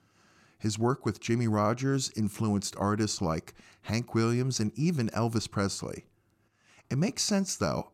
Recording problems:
none

